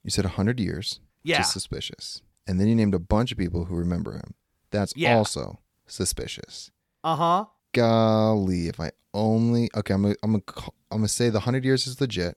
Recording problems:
none

